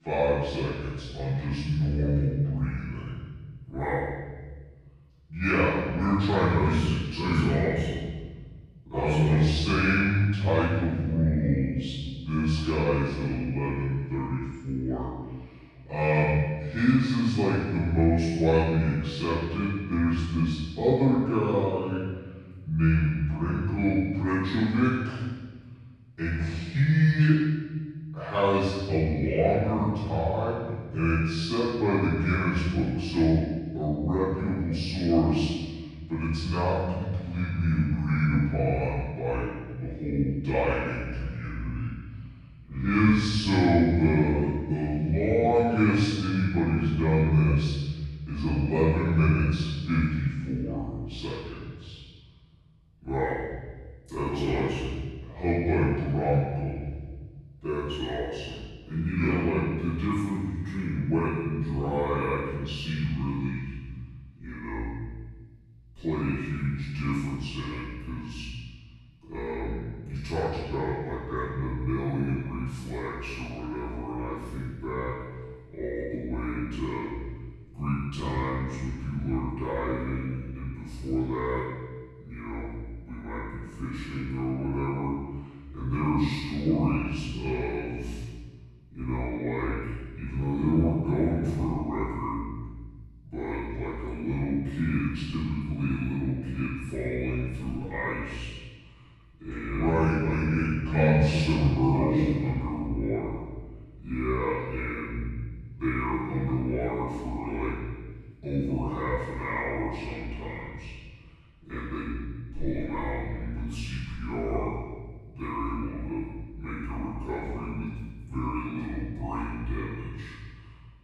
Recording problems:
room echo; strong; dies away in 1.5 s
off-mic speech; far
wrong speed and pitch; too slow and too low; 0.7 times normal speed

